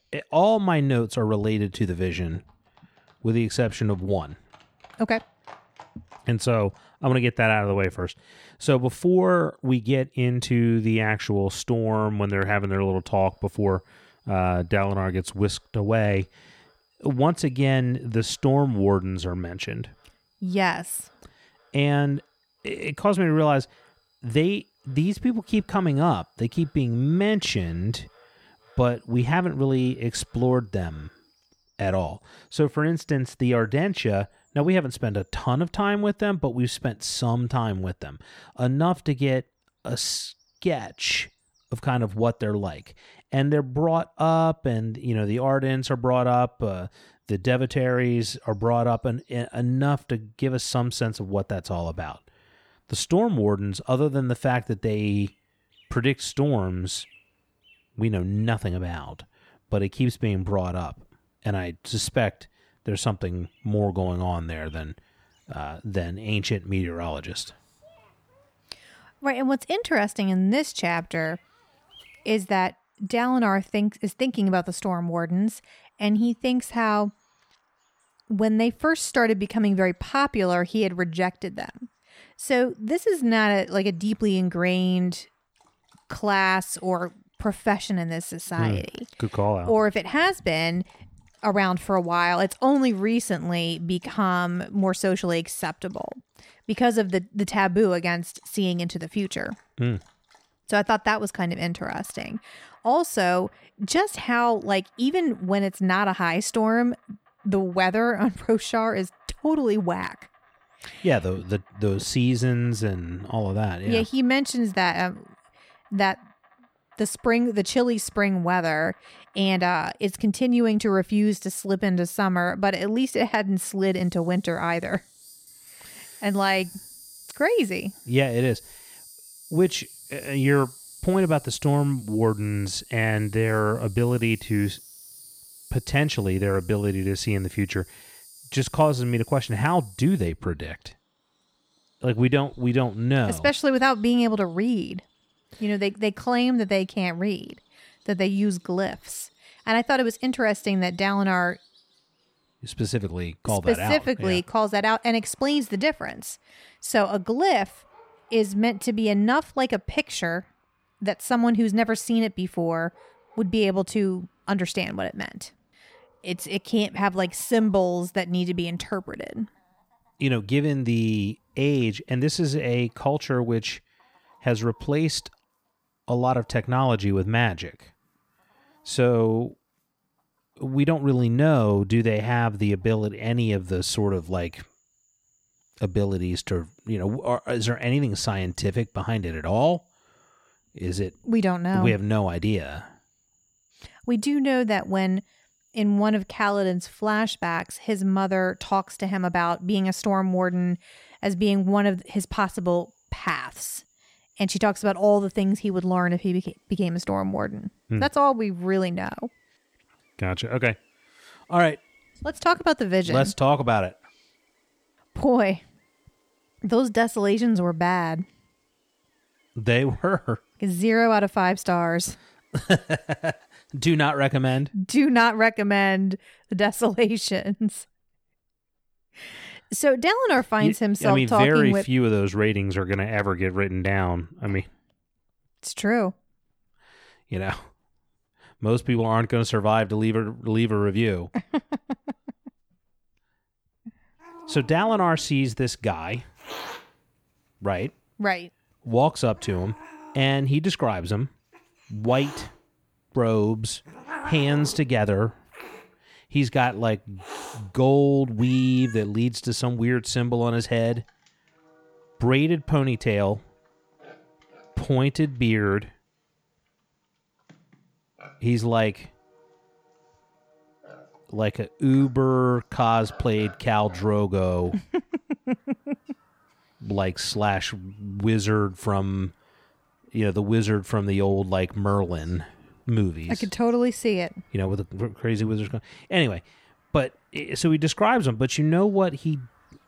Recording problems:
animal sounds; faint; throughout; 25 dB below the speech

